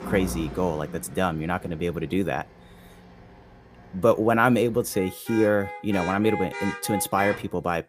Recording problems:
traffic noise; noticeable; throughout; 10 dB below the speech

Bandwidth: 15 kHz